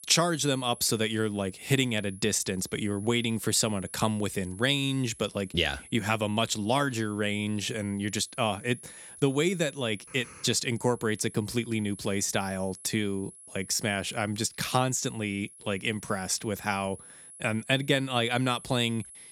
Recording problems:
high-pitched whine; noticeable; throughout; 10.5 kHz, 20 dB below the speech

